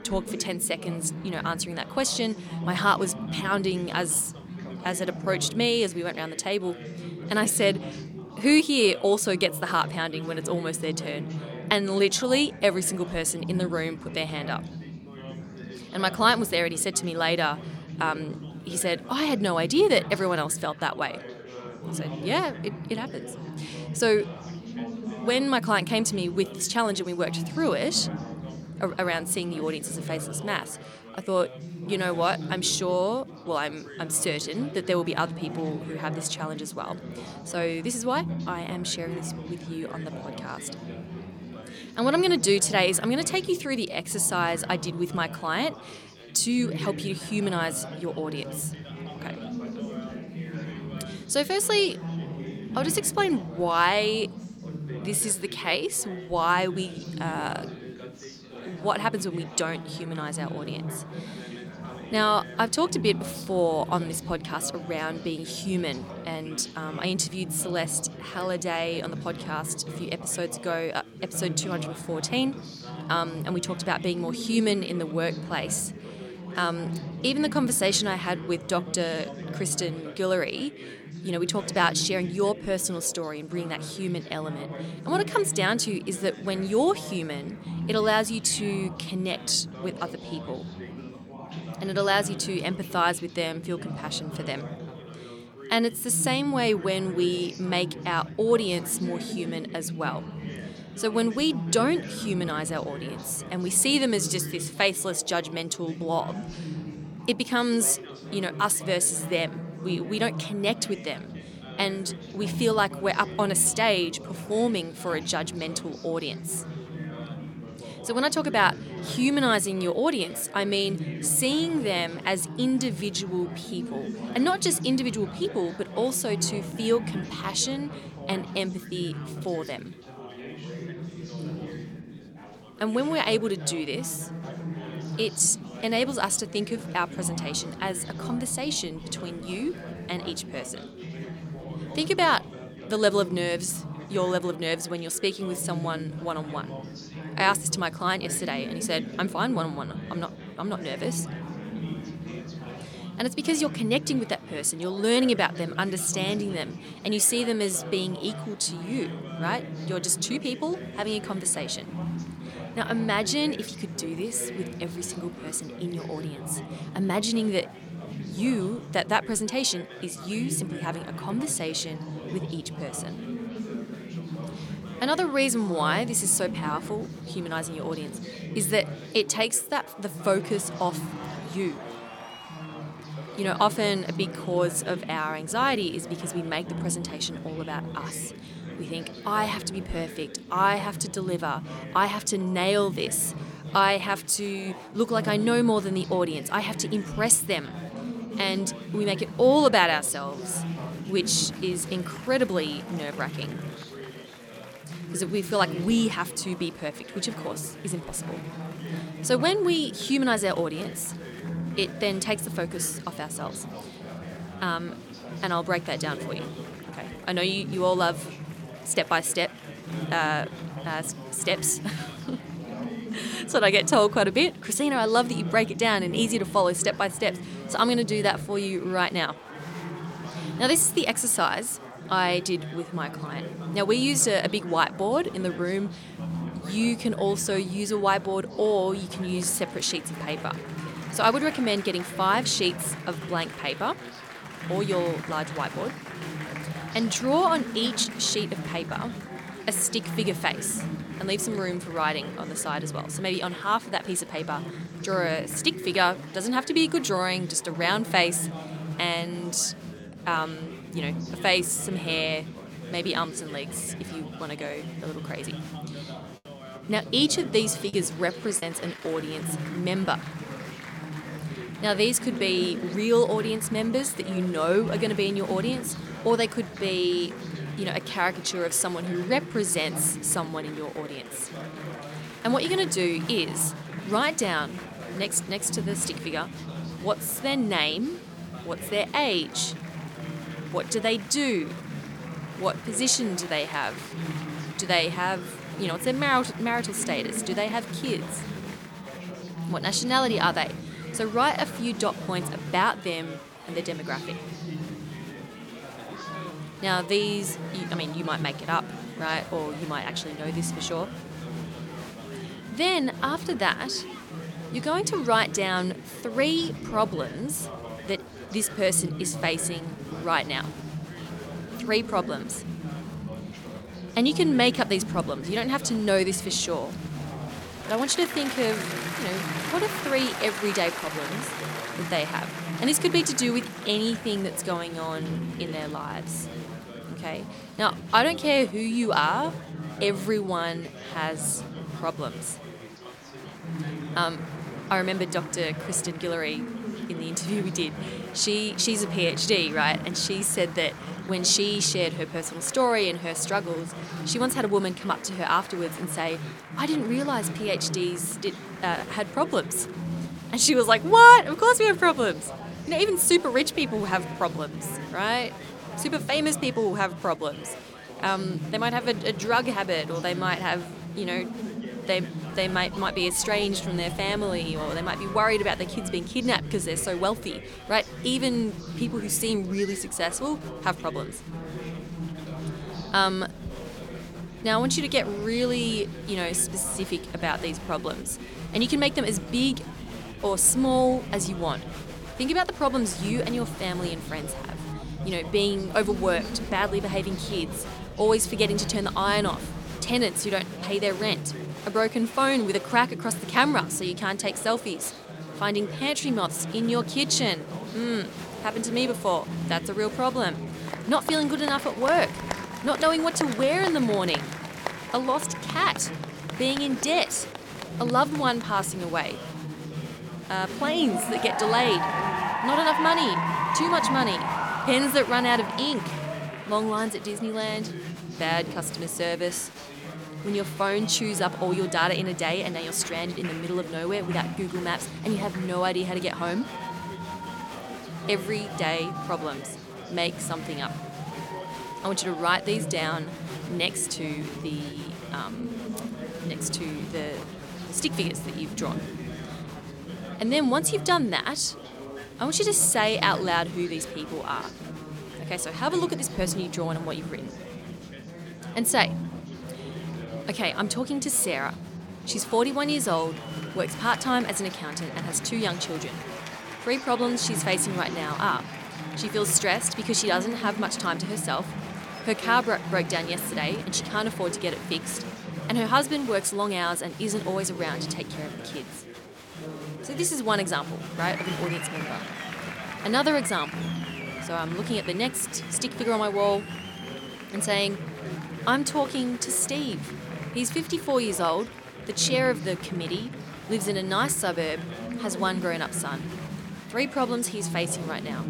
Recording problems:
chatter from many people; loud; throughout; 10 dB below the speech
choppy; occasionally; at 4:28; 3% of the speech affected

